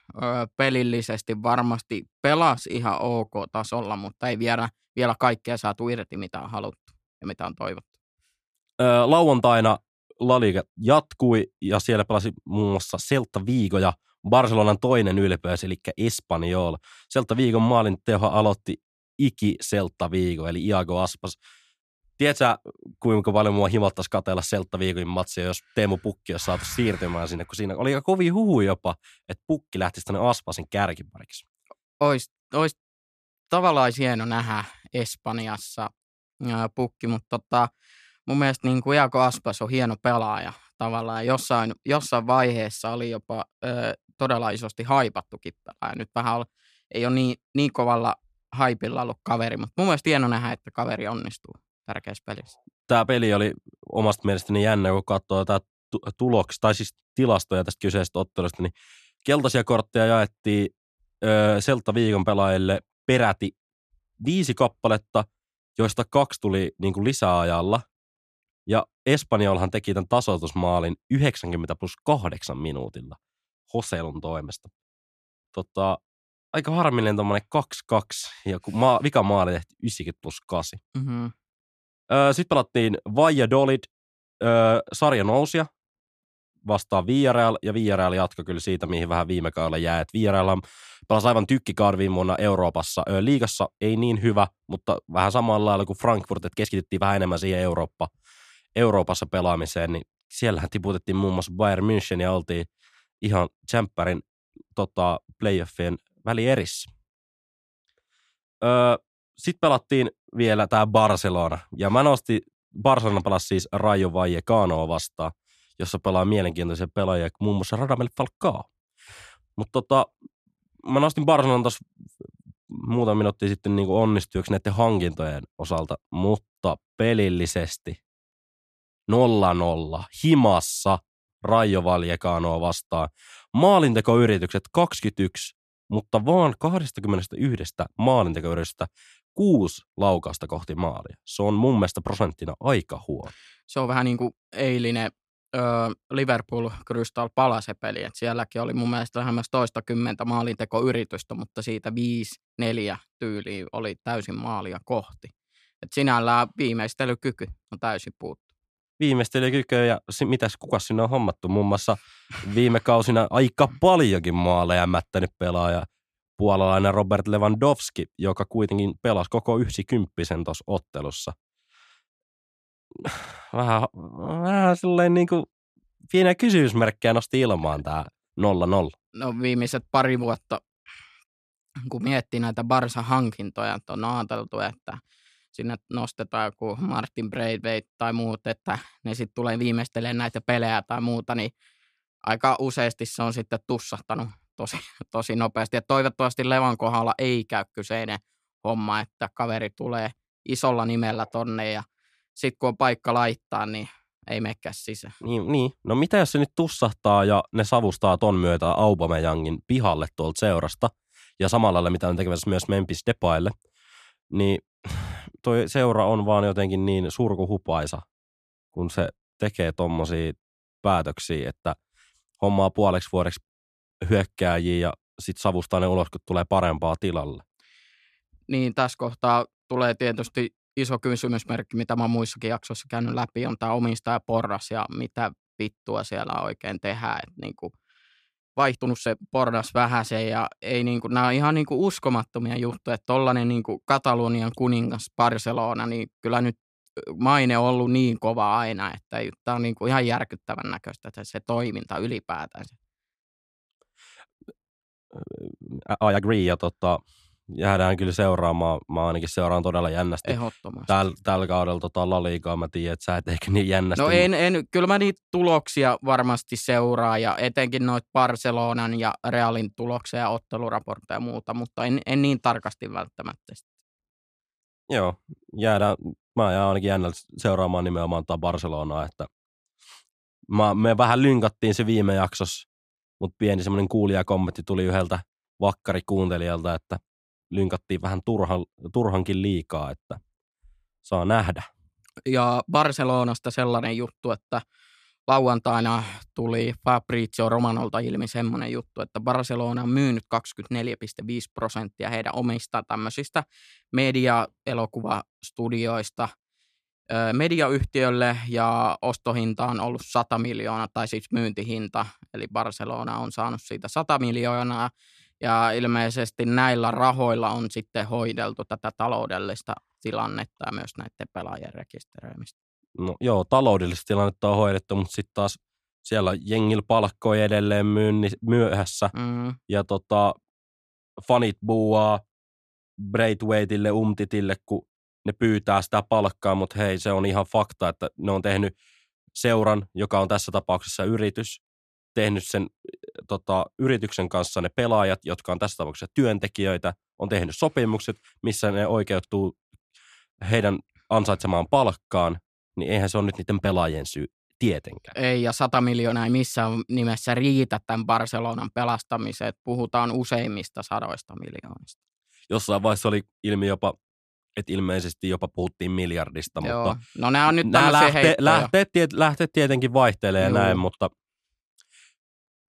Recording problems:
uneven, jittery; strongly; from 2 s to 5:16

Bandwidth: 14 kHz